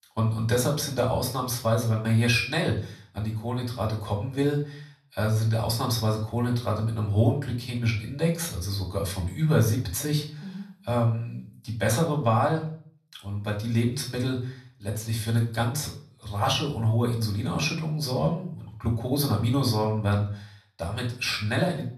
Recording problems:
off-mic speech; far
room echo; slight; dies away in 0.4 s

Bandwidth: 13.5 kHz